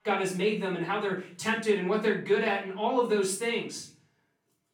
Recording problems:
off-mic speech; far
room echo; noticeable; dies away in 0.4 s

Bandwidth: 17.5 kHz